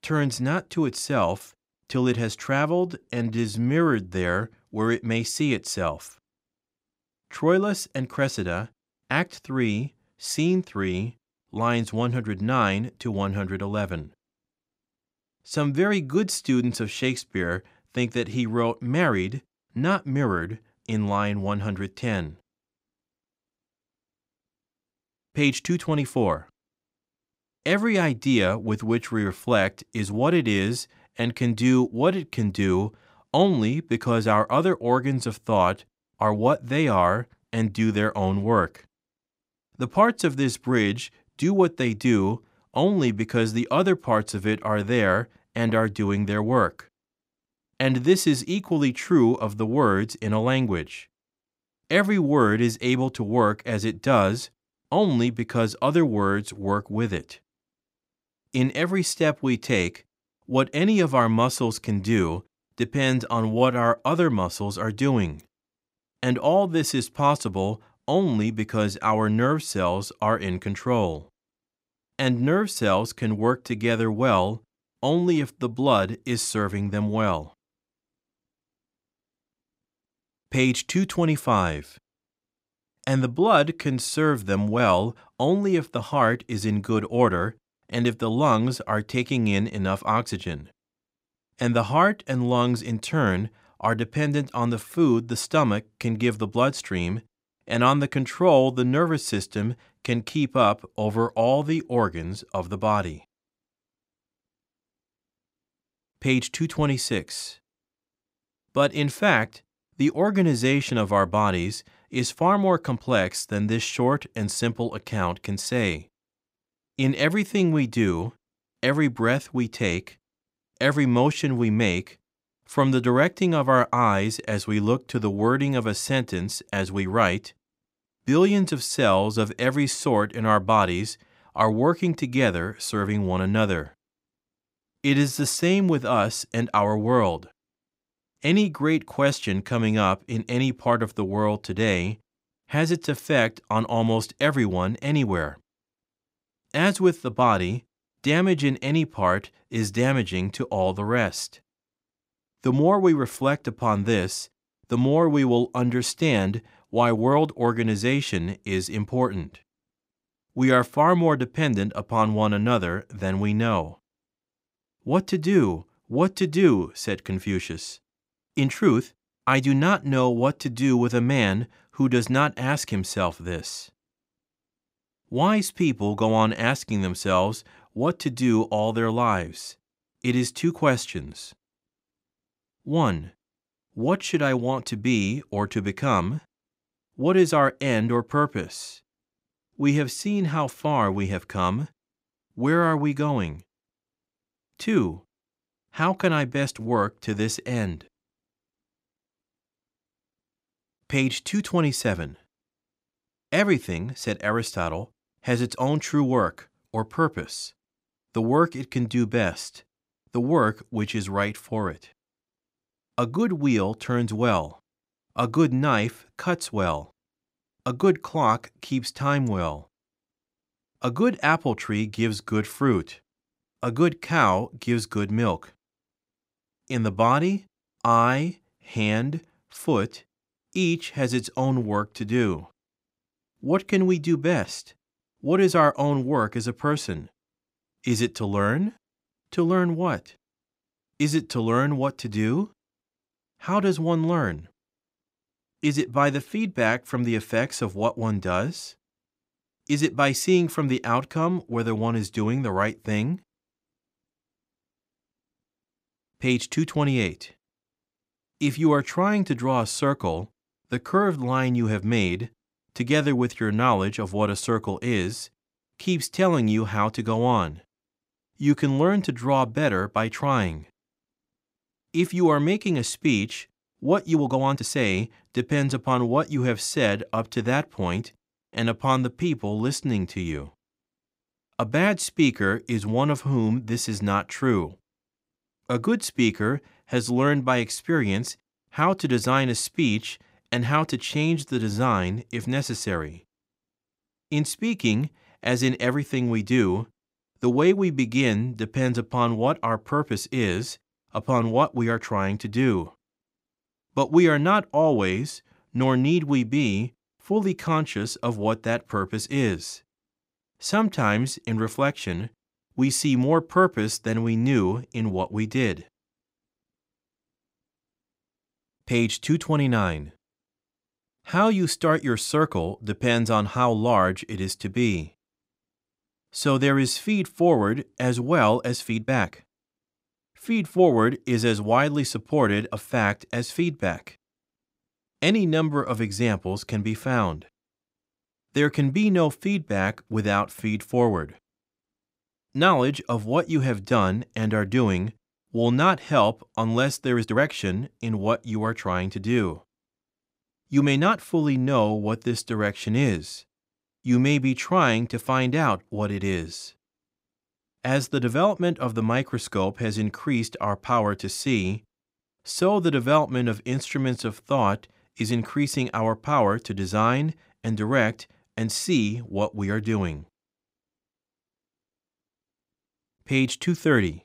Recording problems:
uneven, jittery; strongly; from 2.5 s to 5:52

